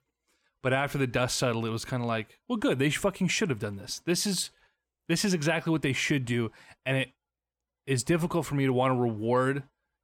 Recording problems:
none

